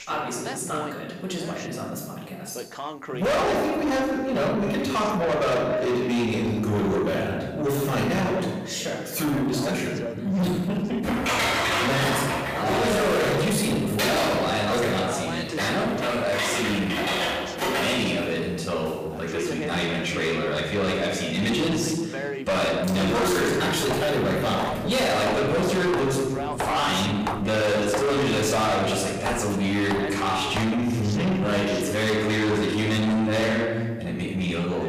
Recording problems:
distortion; heavy; 6 dB below the speech
off-mic speech; far
room echo; noticeable; dies away in 1 s
voice in the background; noticeable; throughout; 10 dB below the speech
keyboard typing; loud; from 11 to 18 s; peak 3 dB above the speech
footsteps; noticeable; from 23 to 31 s; peak 6 dB below the speech

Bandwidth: 15 kHz